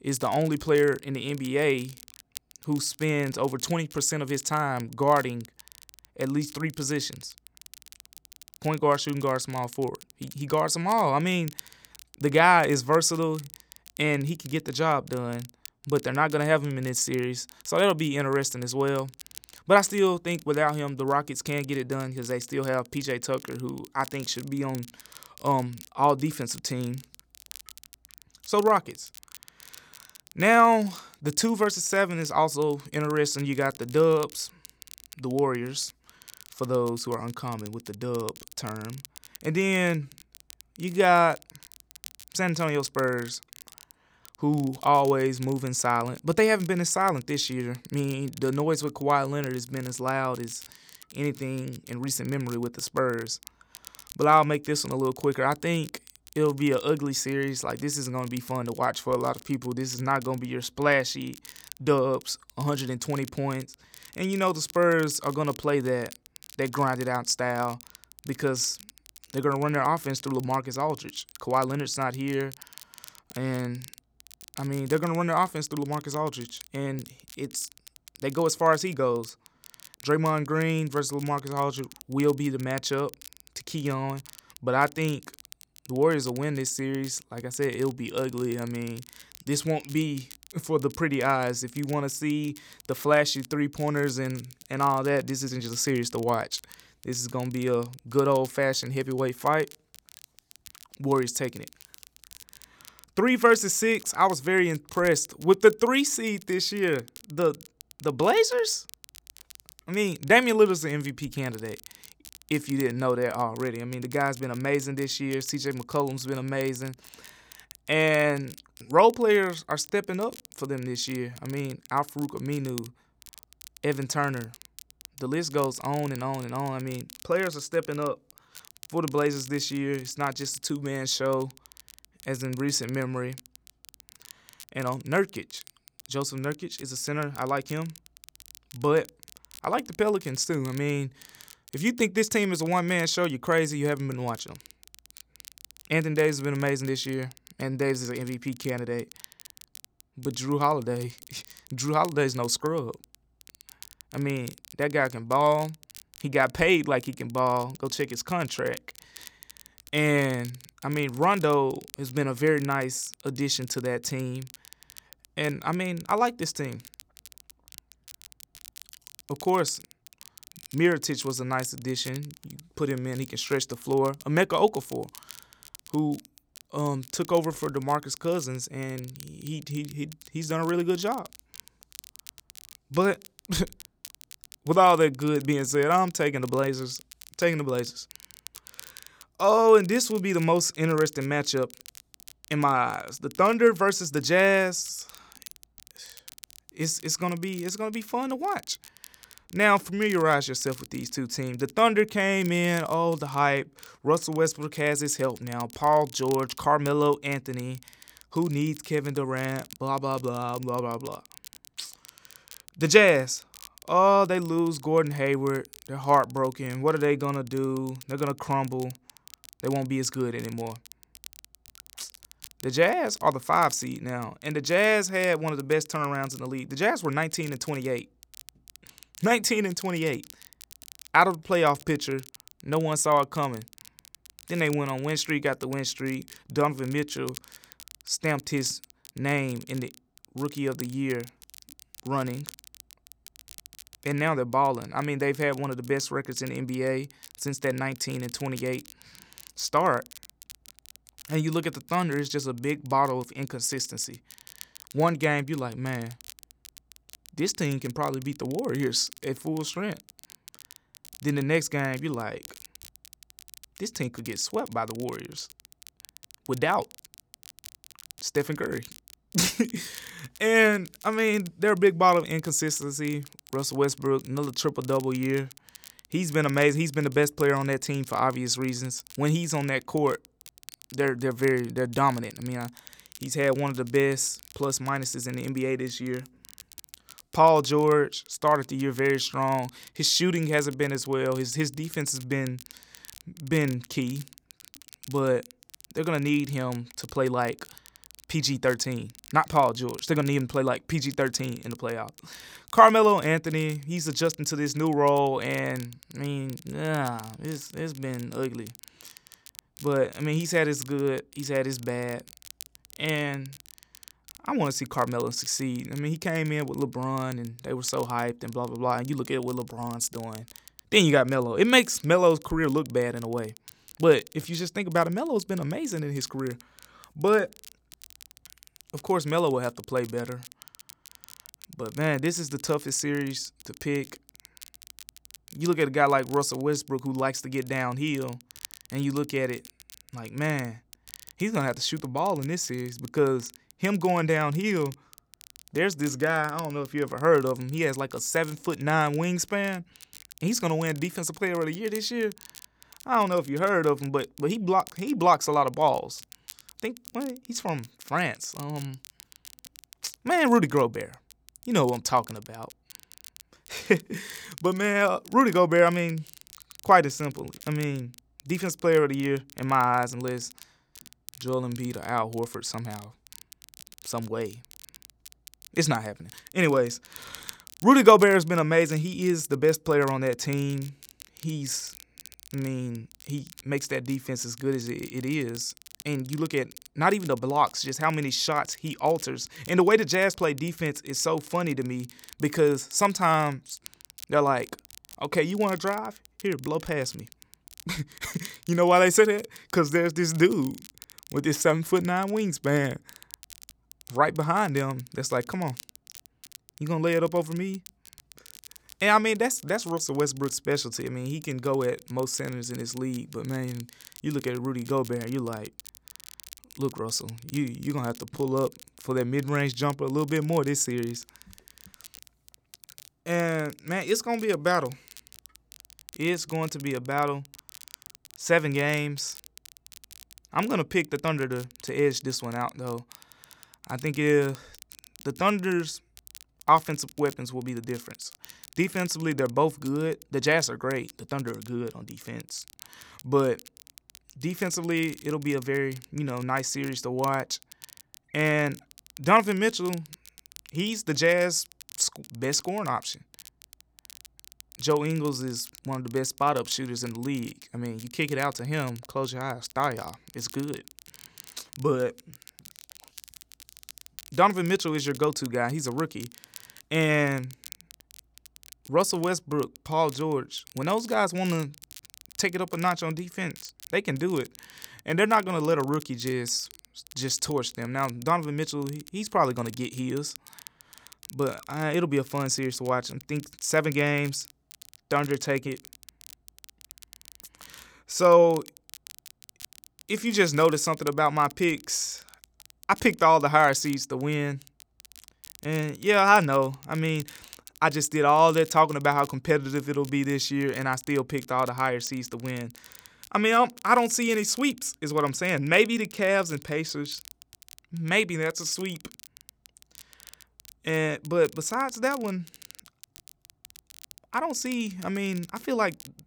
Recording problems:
crackle, like an old record; faint; 20 dB below the speech

